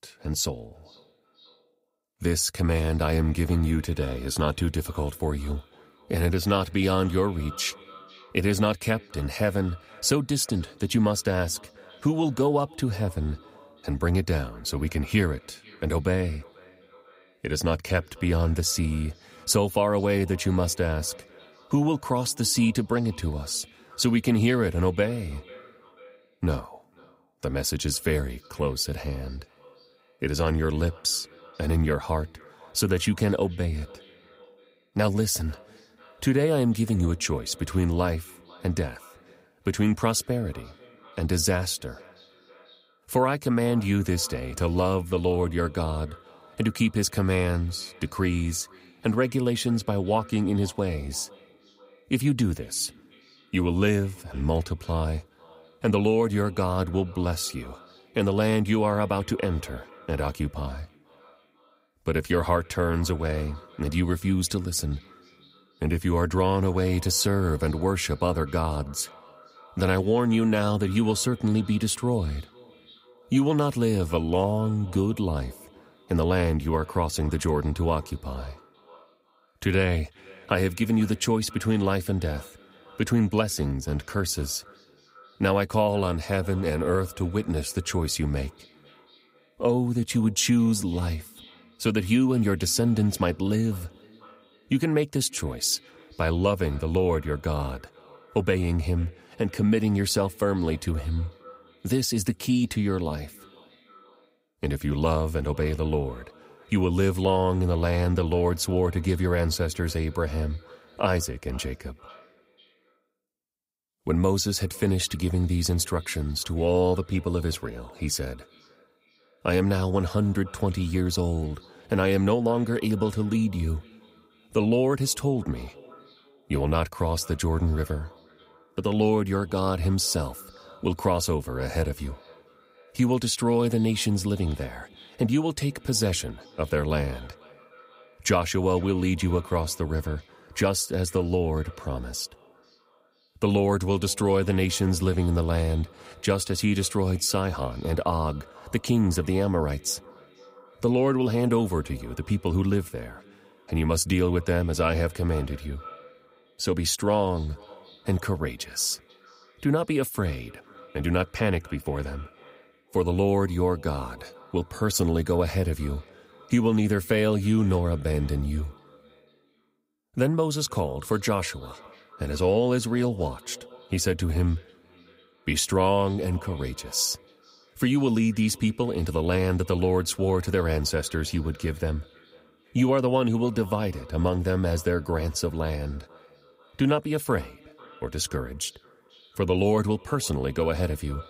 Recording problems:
echo of what is said; faint; throughout; 490 ms later, 25 dB below the speech

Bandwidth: 15.5 kHz